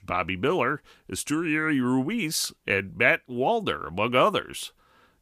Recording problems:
none

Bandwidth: 15 kHz